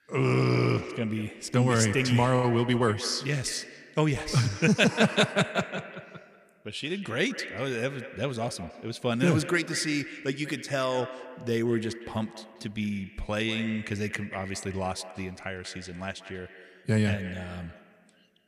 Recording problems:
echo of what is said; noticeable; throughout; 190 ms later, 15 dB below the speech

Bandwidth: 14.5 kHz